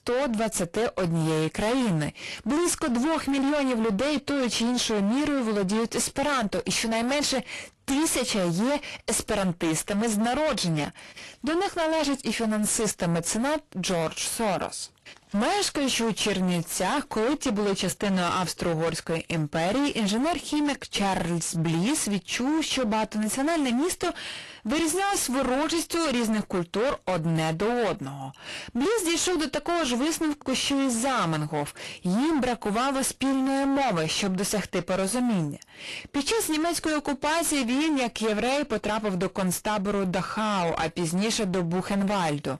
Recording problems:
distortion; heavy; 32% of the sound clipped
garbled, watery; slightly; nothing above 11.5 kHz

